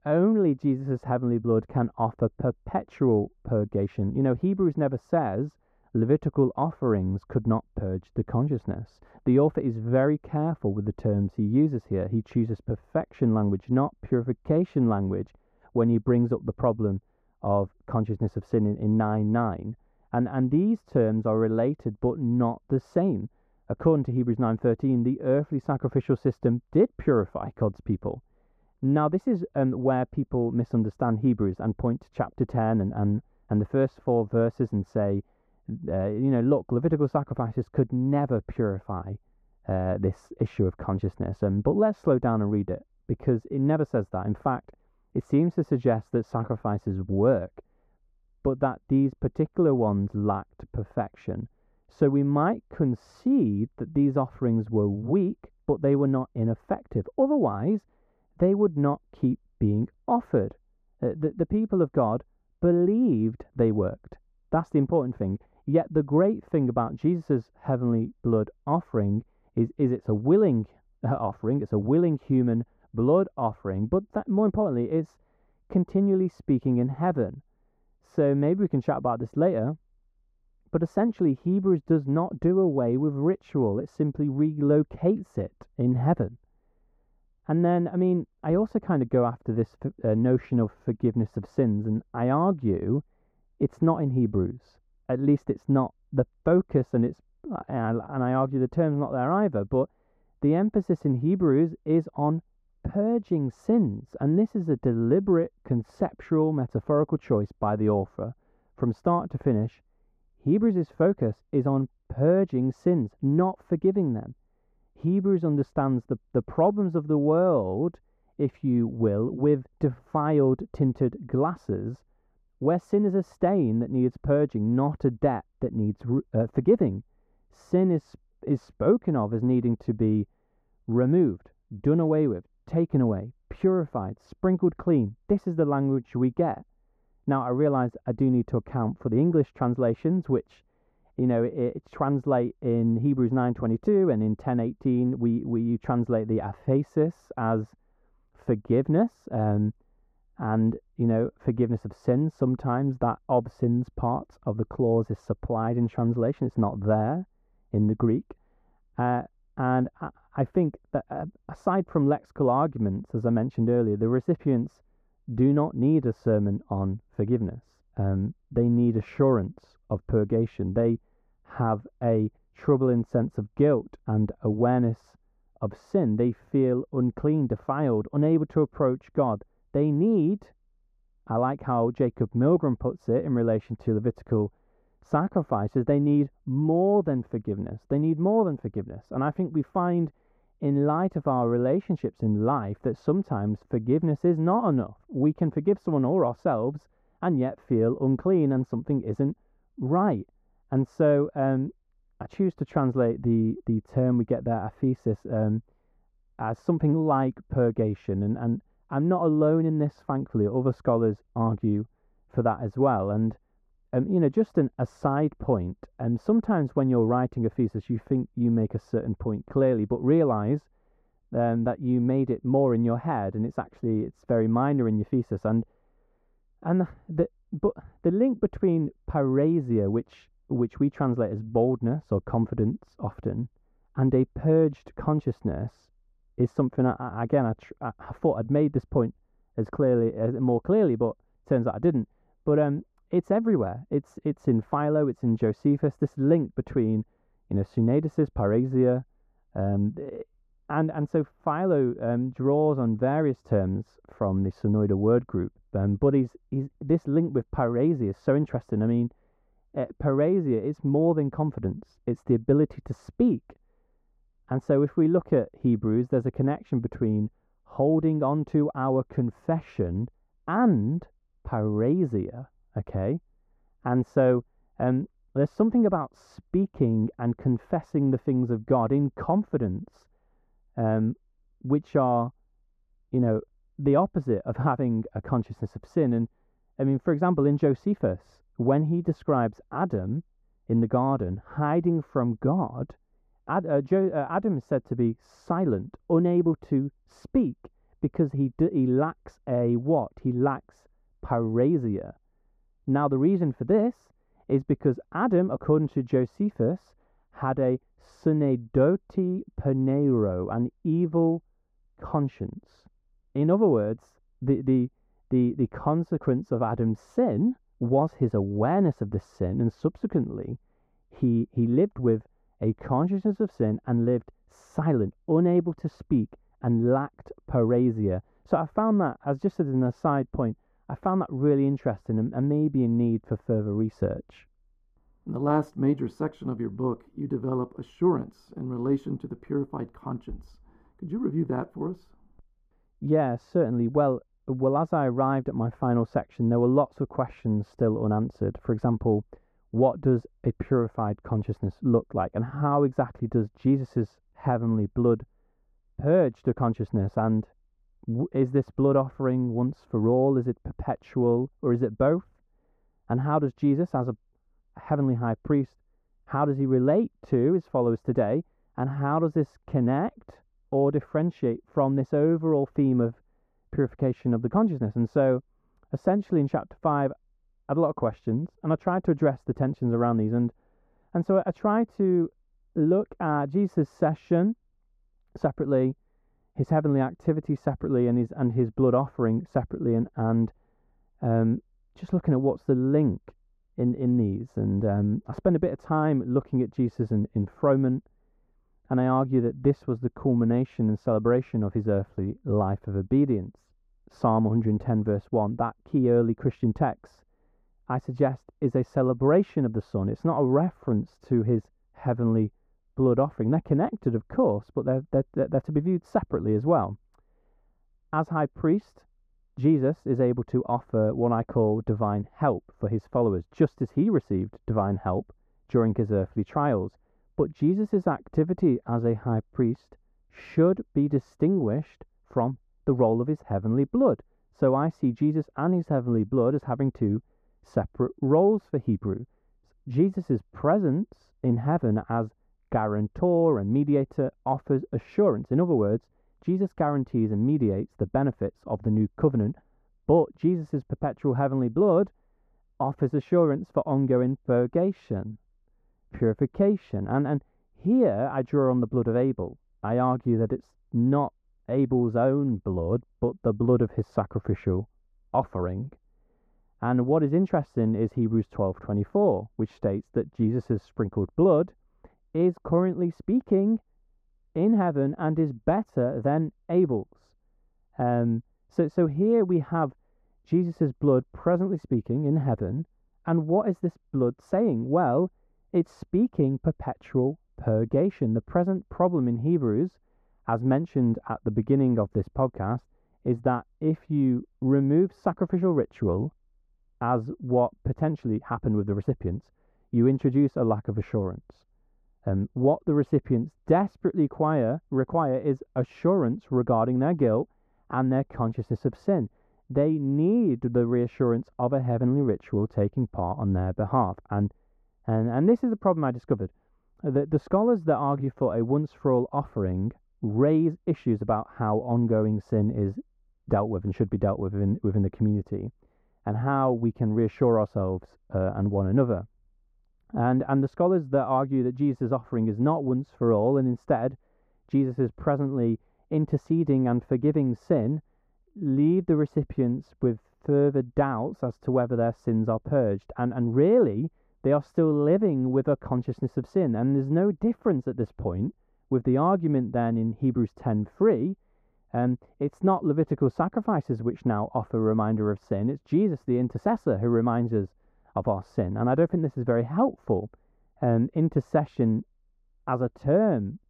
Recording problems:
muffled; very; fading above 1.5 kHz

